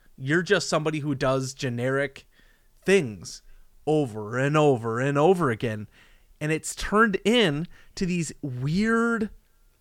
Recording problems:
none

